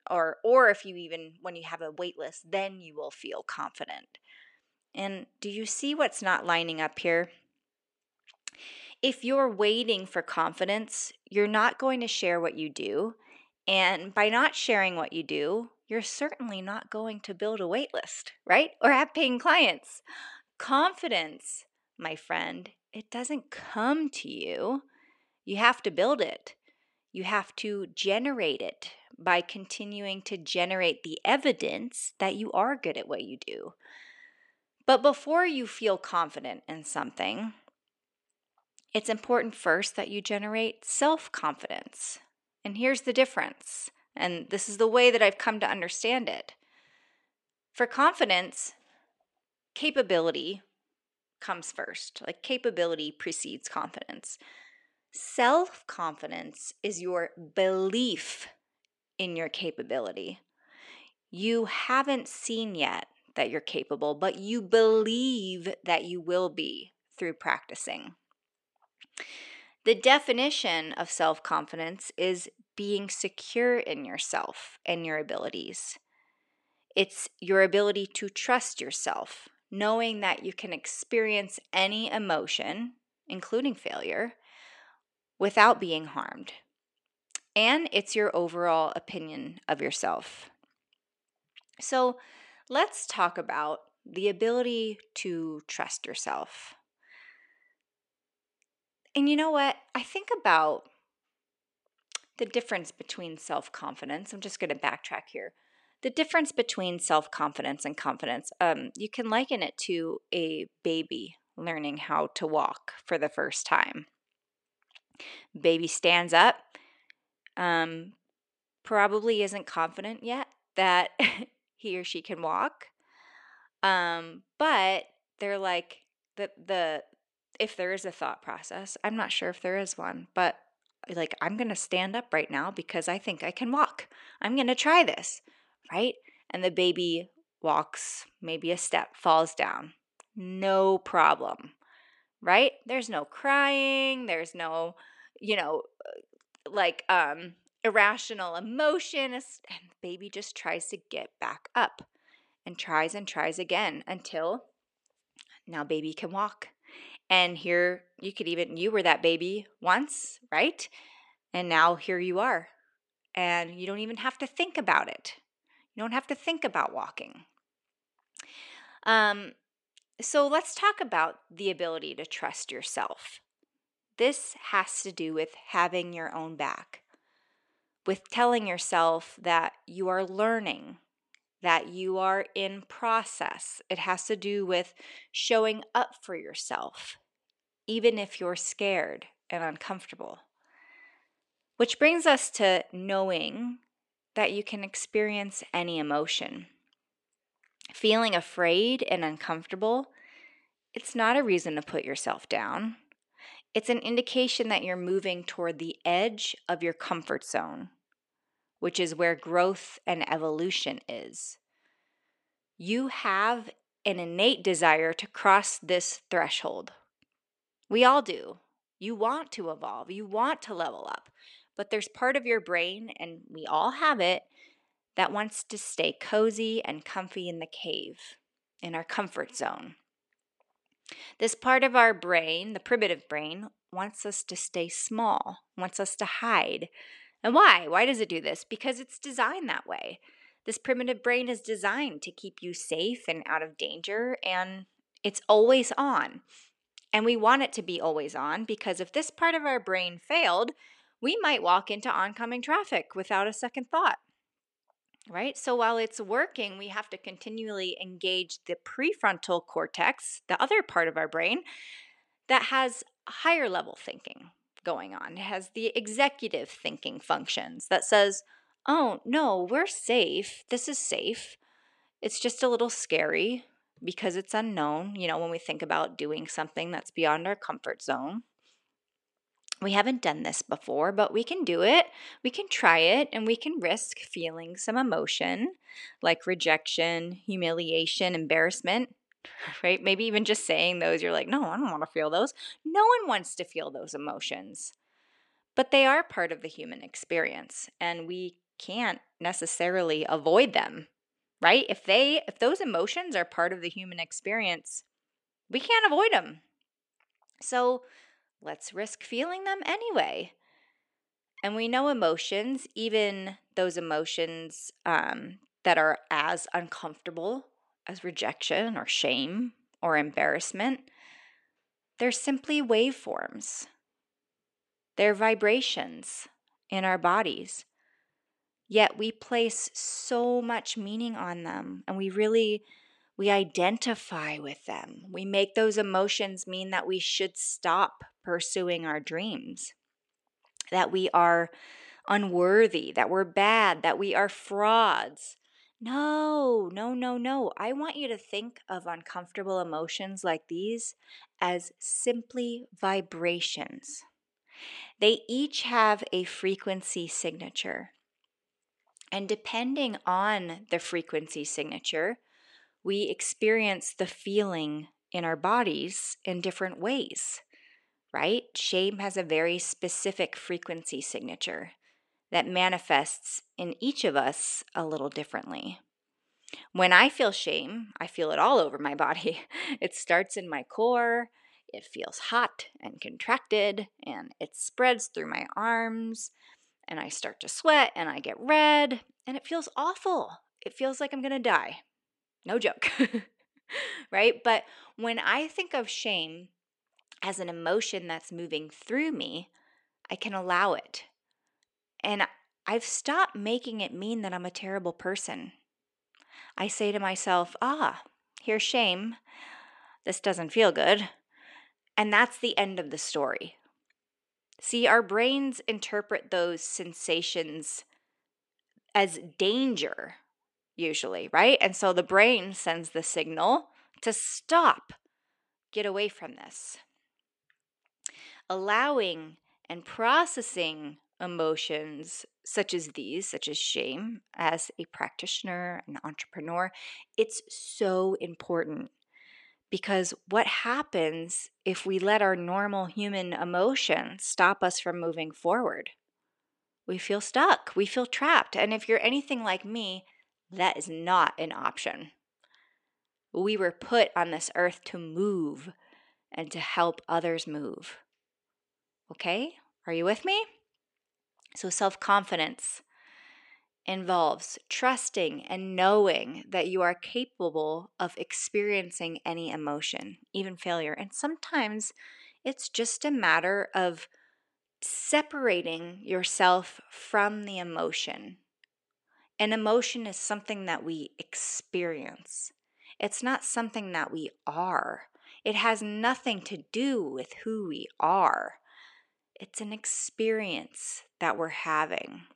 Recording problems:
thin; very slightly; fading below 350 Hz

